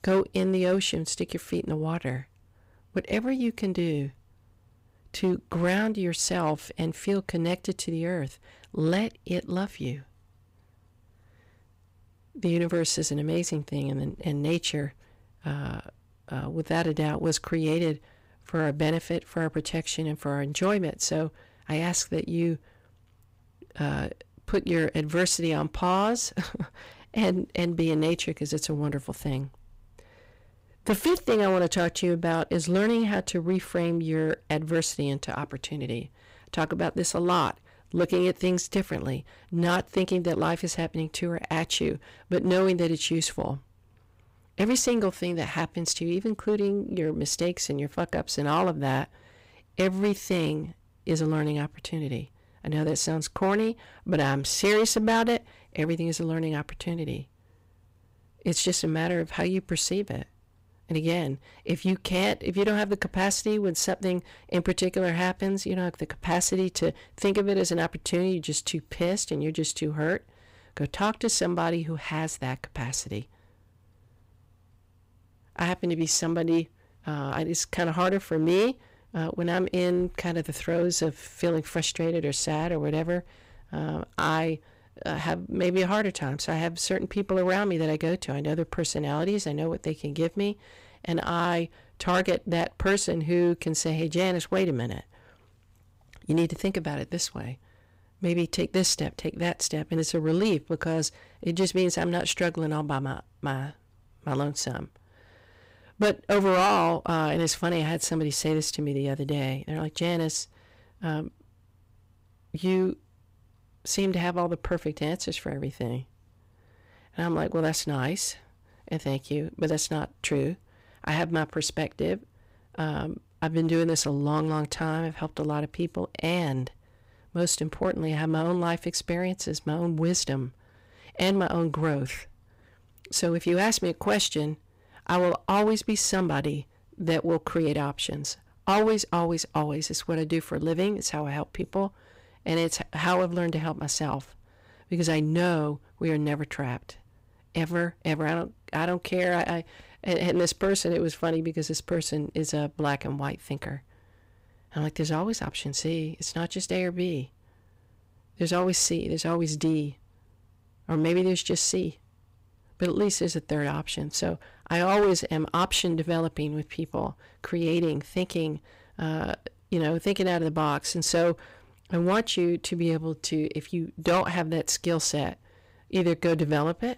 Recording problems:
distortion; slight; 4% of the sound clipped

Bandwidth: 15.5 kHz